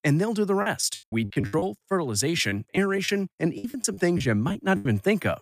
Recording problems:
choppy; very; 14% of the speech affected

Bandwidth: 15 kHz